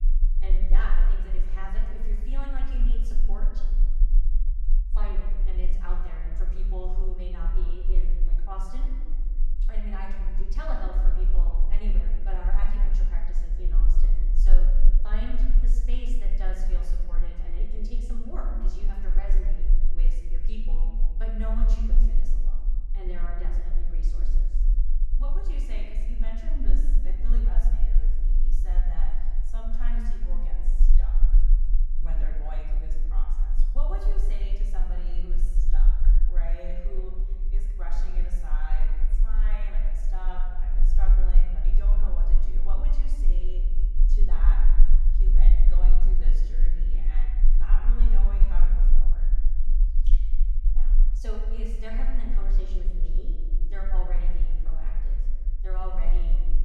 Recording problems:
off-mic speech; far
room echo; noticeable; dies away in 1.4 s
low rumble; noticeable; throughout; 10 dB below the speech

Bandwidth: 18 kHz